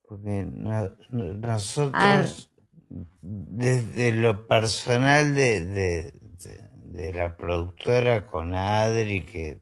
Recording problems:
wrong speed, natural pitch; too slow; 0.5 times normal speed
garbled, watery; slightly

